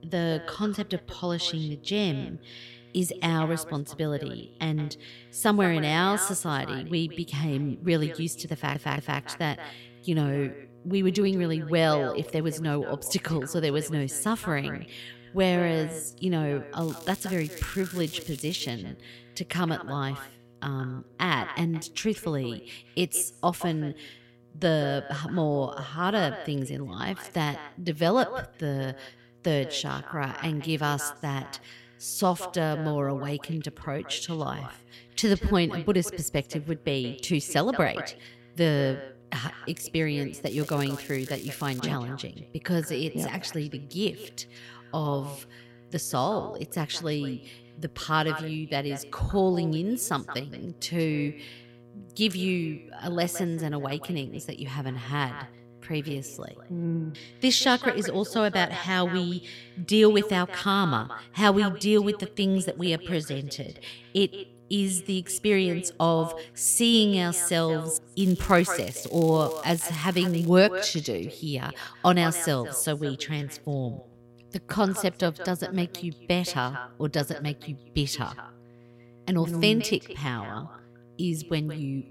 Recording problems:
echo of what is said; noticeable; throughout; 170 ms later, 15 dB below the speech
crackling; noticeable; from 17 to 19 s, from 40 to 42 s and from 1:08 to 1:10; 15 dB below the speech
electrical hum; faint; throughout; 60 Hz, 30 dB below the speech
audio stuttering; at 8.5 s

